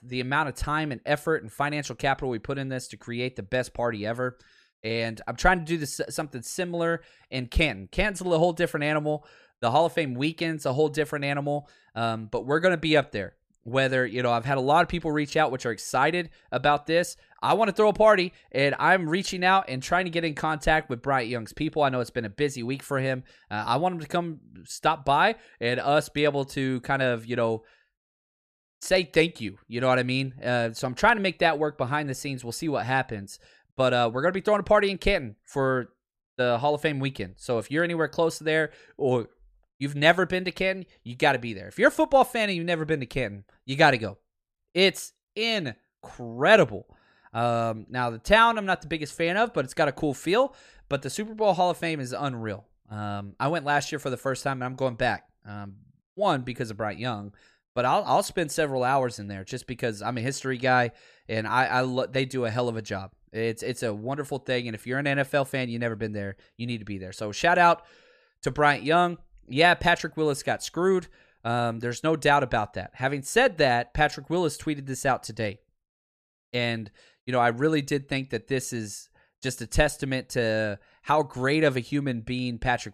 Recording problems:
none

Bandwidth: 14.5 kHz